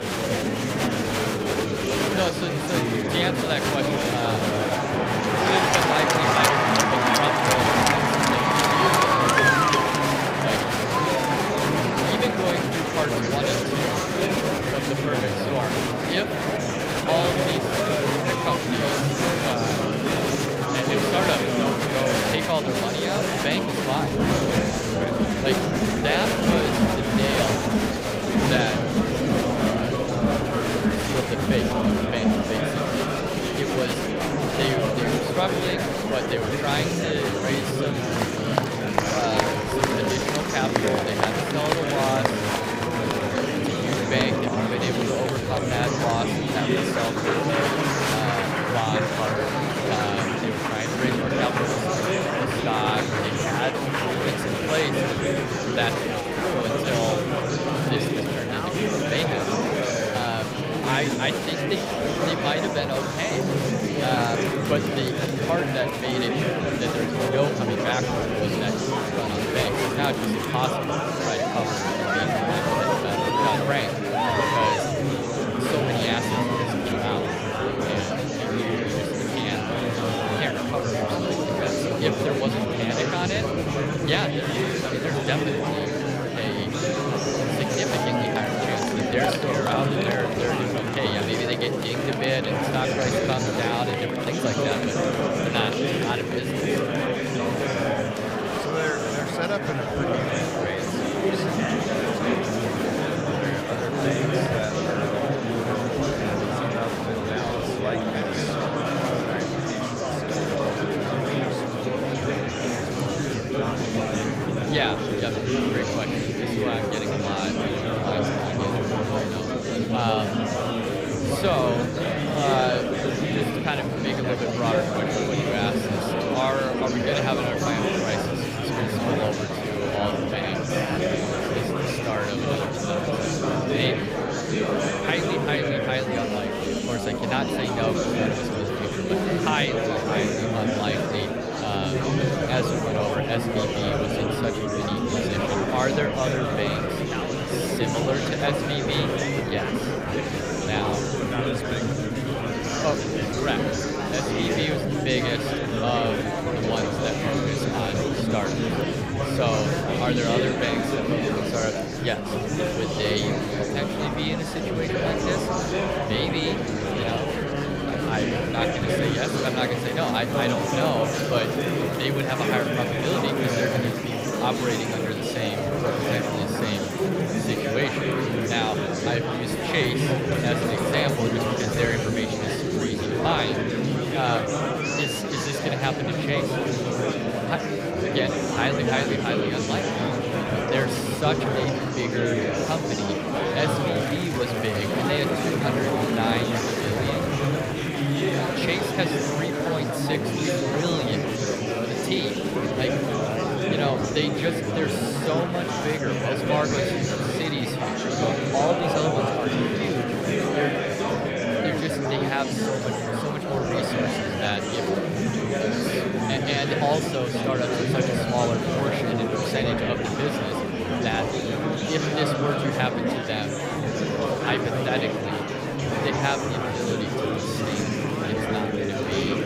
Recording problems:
murmuring crowd; very loud; throughout; 5 dB above the speech

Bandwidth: 15.5 kHz